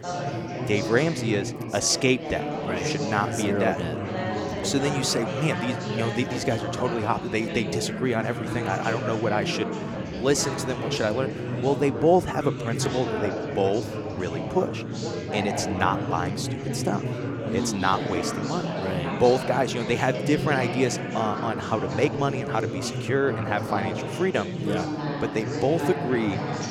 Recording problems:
chatter from many people; loud; throughout; 3 dB below the speech

